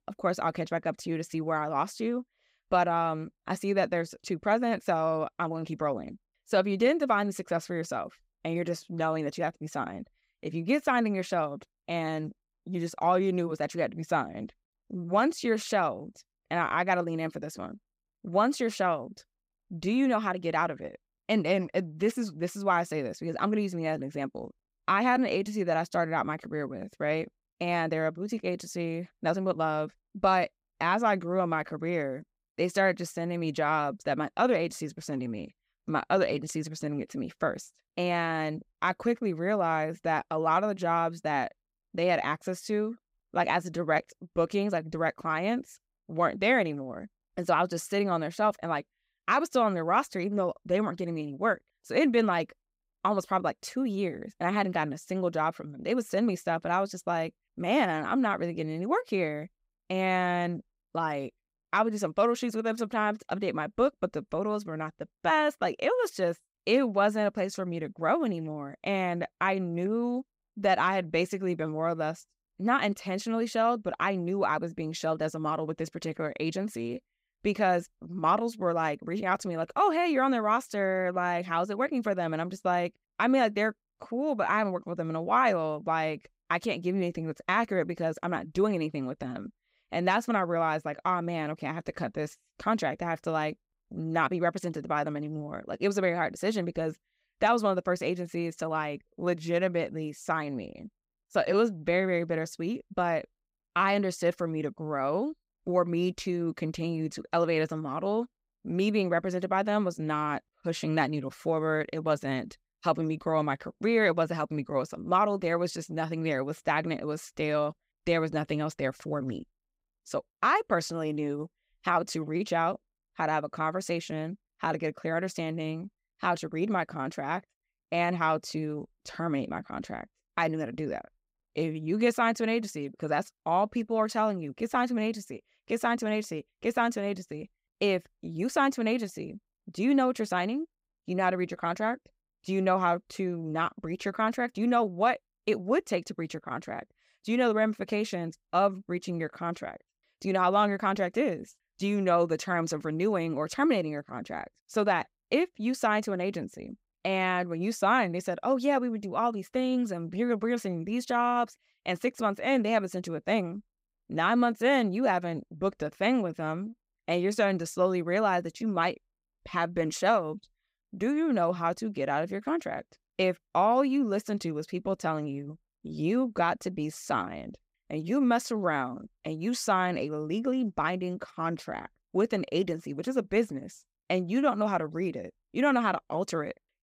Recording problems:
none

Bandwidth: 15.5 kHz